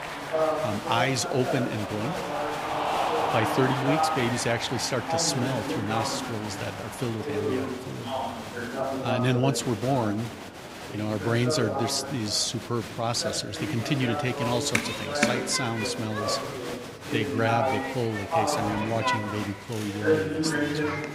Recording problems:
chatter from many people; loud; throughout; 1 dB below the speech

